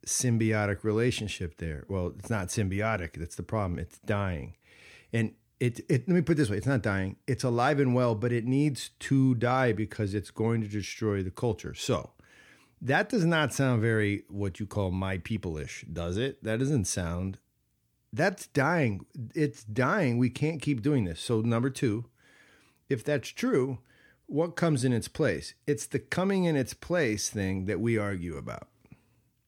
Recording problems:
none

